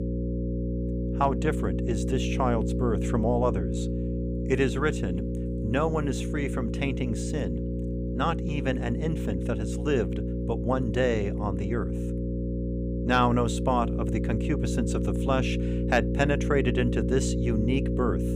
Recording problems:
electrical hum; loud; throughout; 60 Hz, 7 dB below the speech

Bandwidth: 15.5 kHz